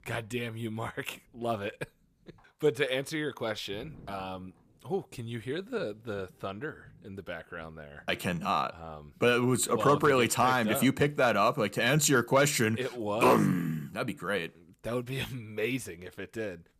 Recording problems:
none

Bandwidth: 14.5 kHz